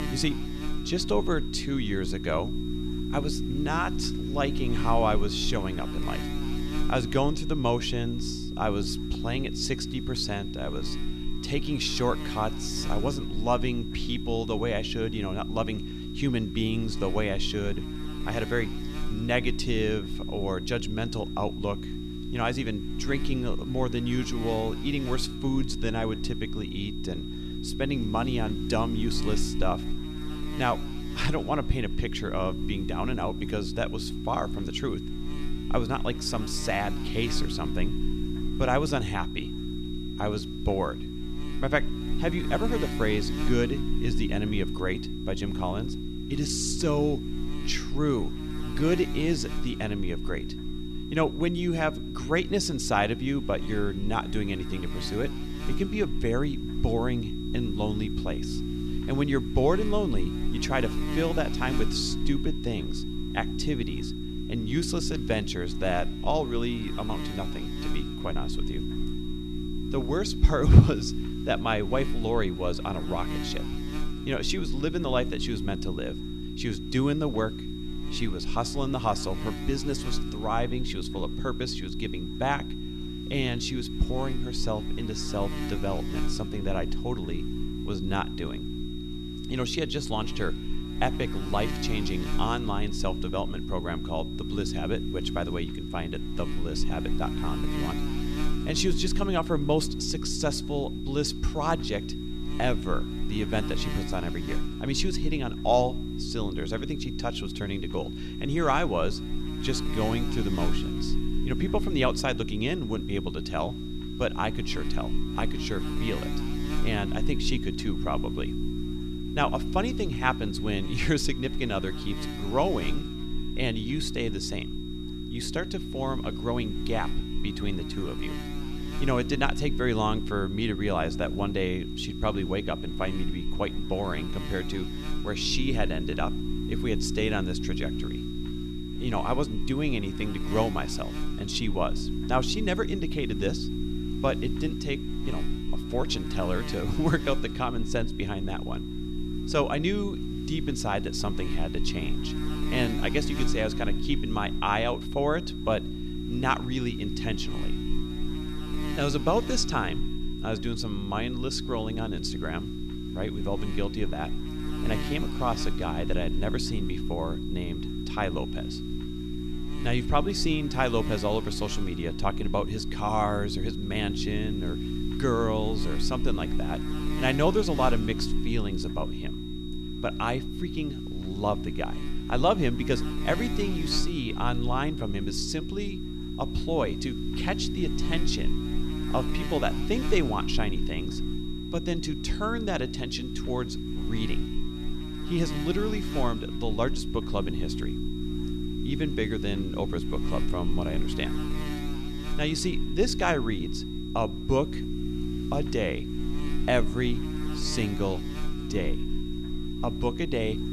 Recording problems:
electrical hum; loud; throughout; 60 Hz, 8 dB below the speech
high-pitched whine; noticeable; throughout; 4 kHz, 15 dB below the speech

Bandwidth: 14 kHz